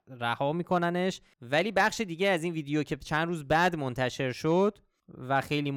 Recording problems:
abrupt cut into speech; at the end

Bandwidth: 19 kHz